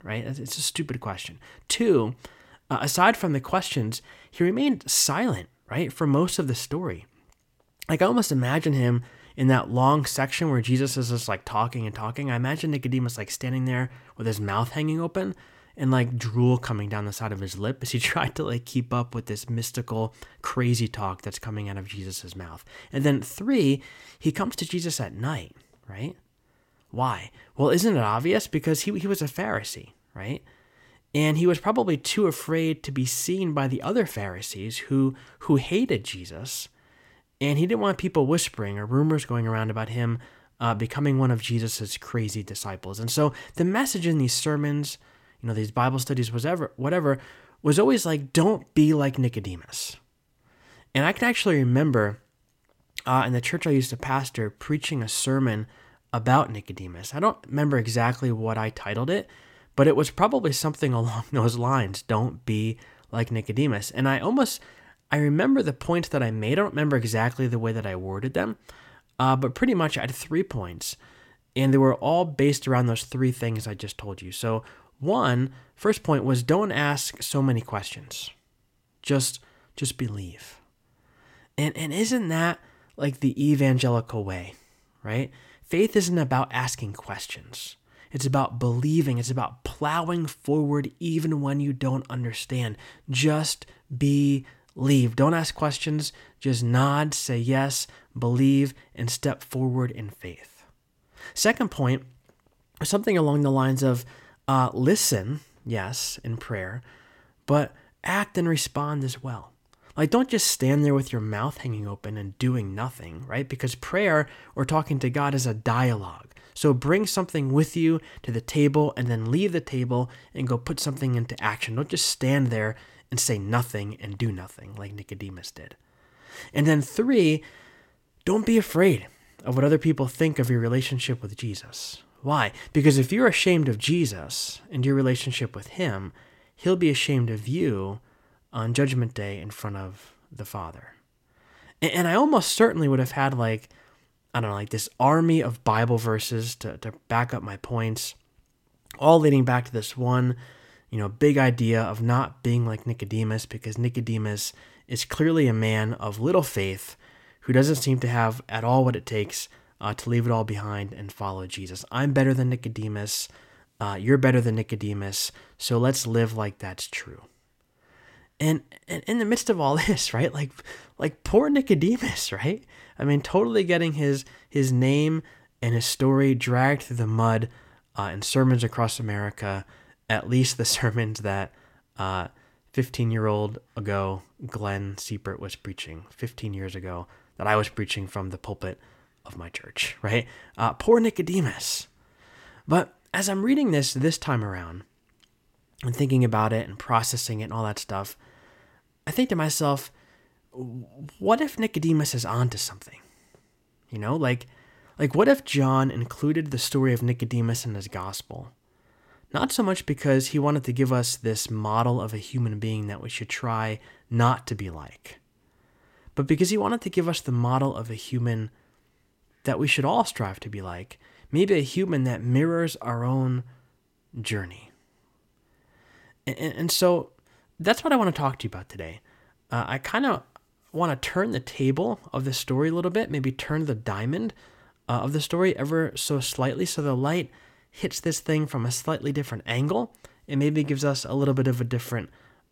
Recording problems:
none

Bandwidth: 16.5 kHz